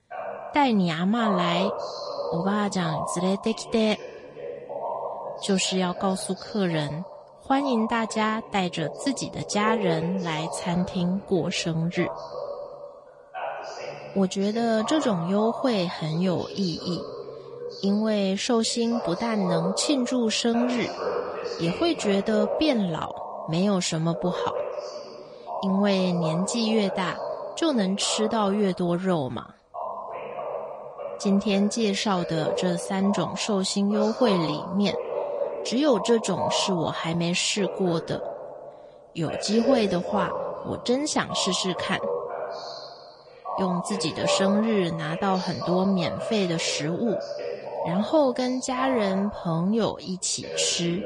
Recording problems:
garbled, watery; slightly
voice in the background; loud; throughout; 7 dB below the speech

